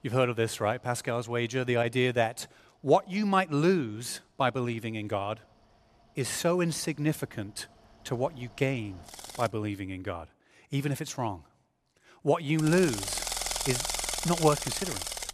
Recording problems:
machinery noise; loud; throughout; 3 dB below the speech

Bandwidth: 14.5 kHz